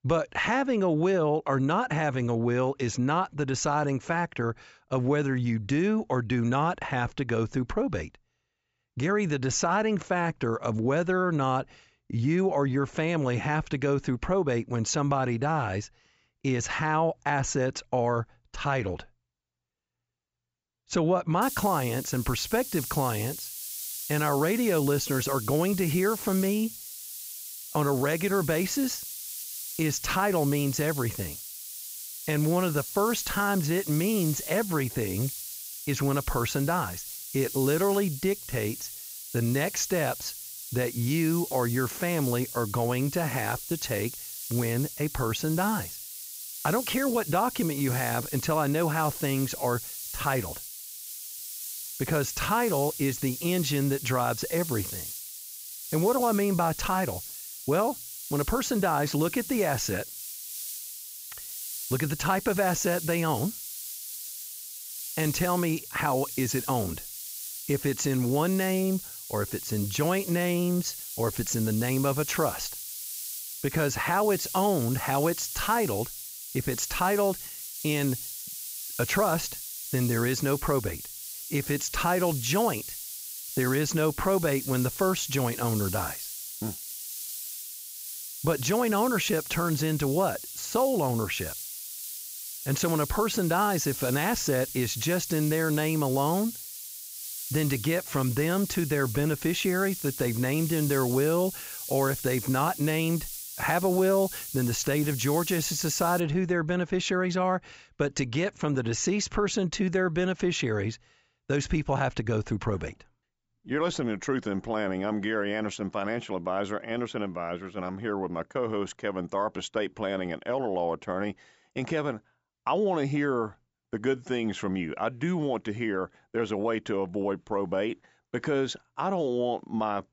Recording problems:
high frequencies cut off; noticeable; nothing above 7.5 kHz
hiss; loud; from 21 s to 1:46; 8 dB below the speech

